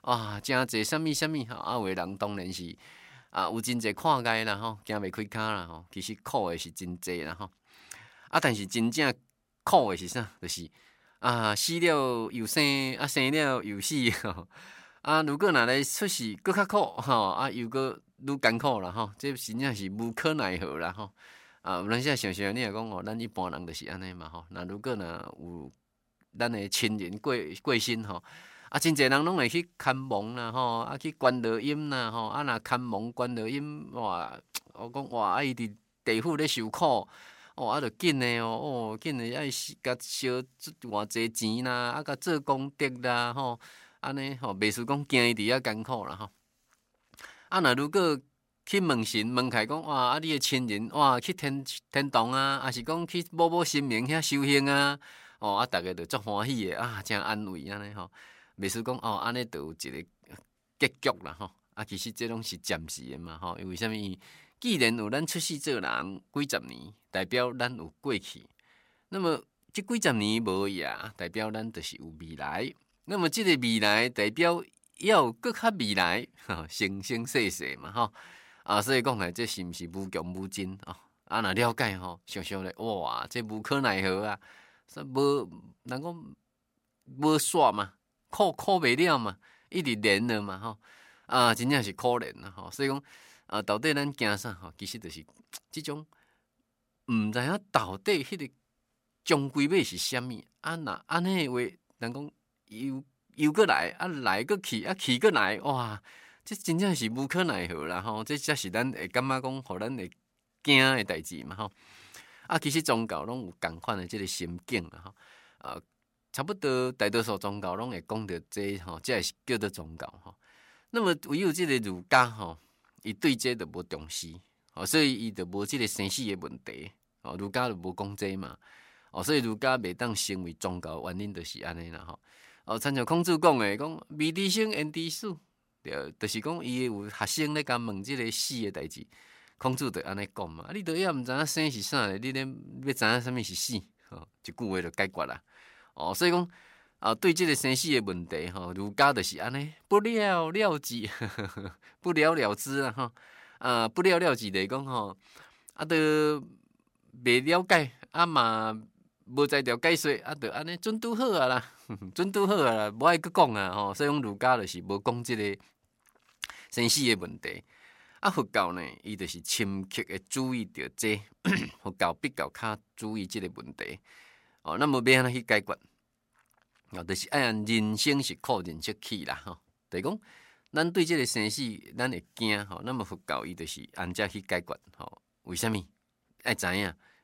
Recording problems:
none

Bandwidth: 16 kHz